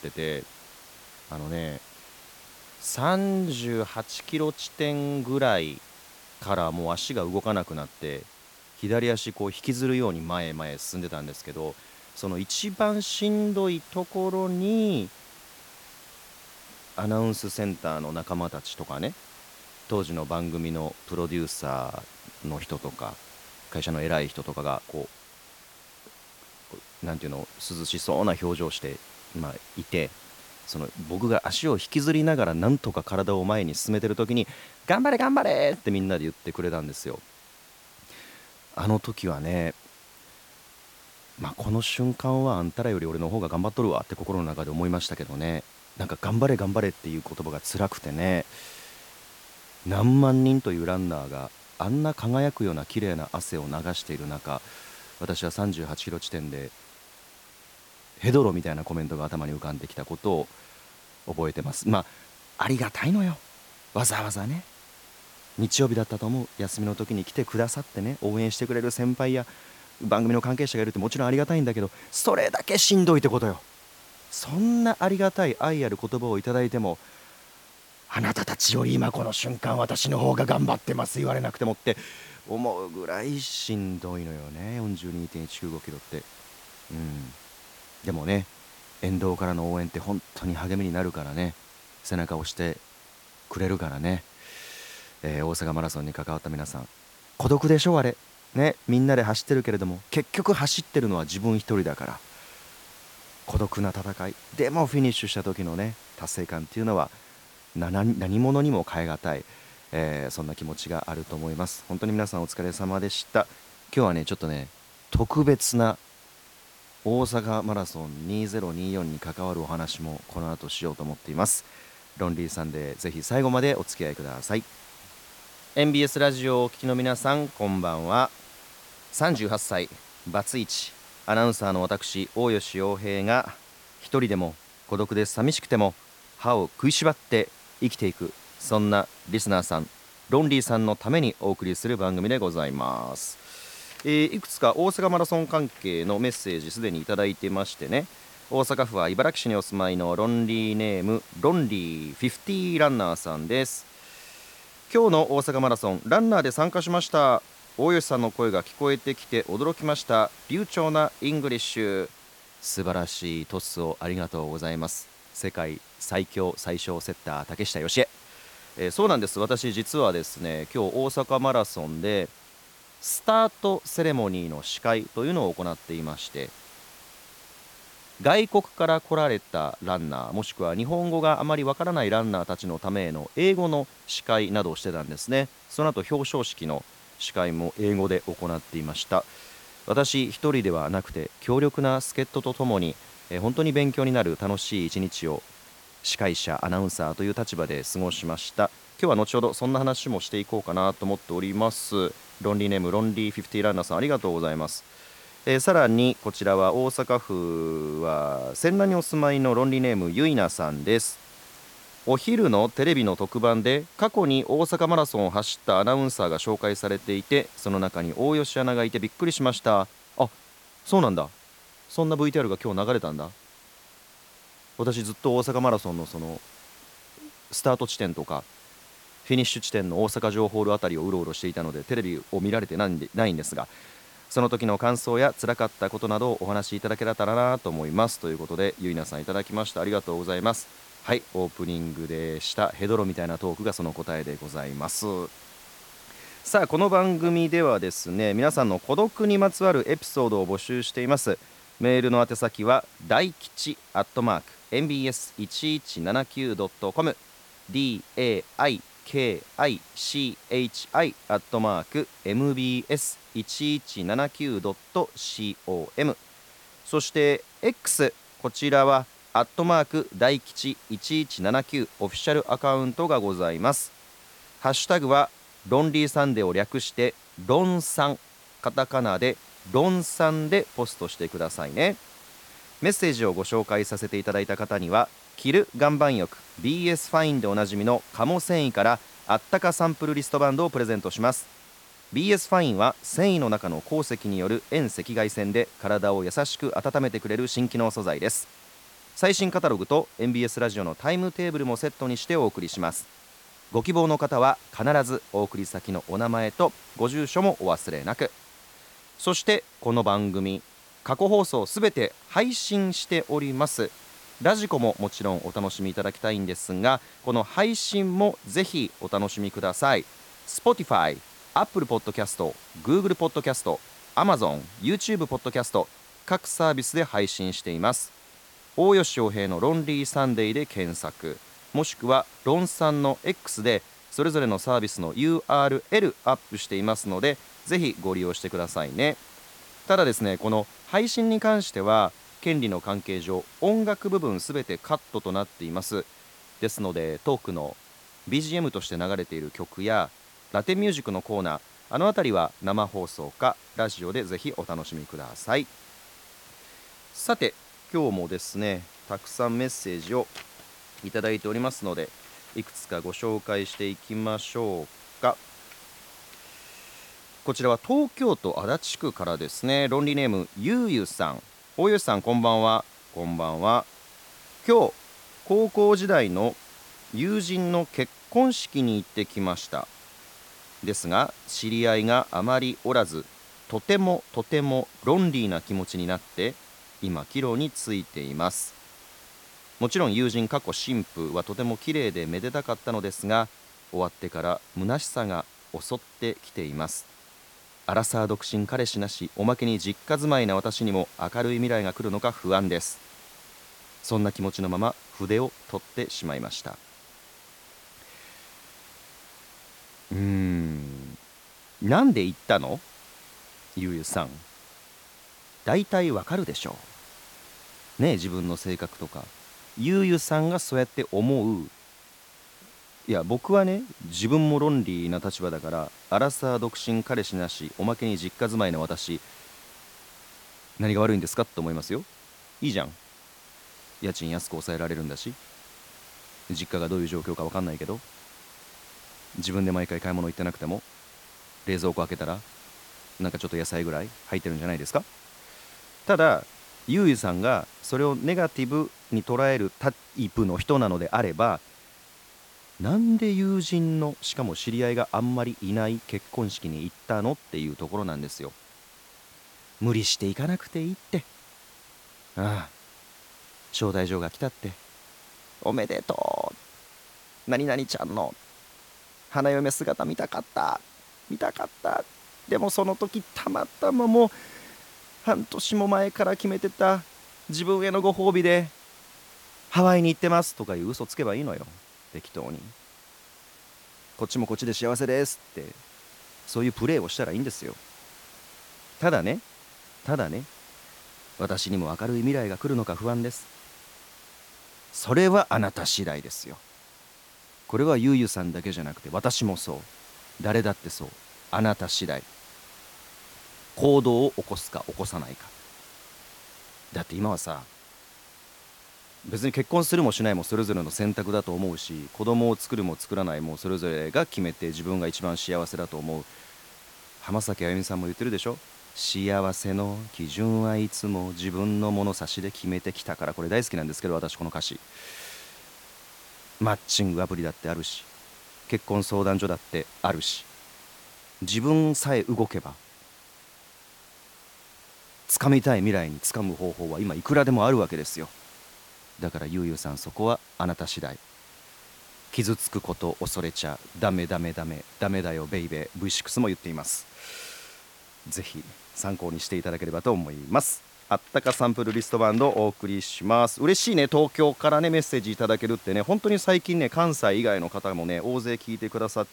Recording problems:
hiss; faint; throughout; 20 dB below the speech

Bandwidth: 17.5 kHz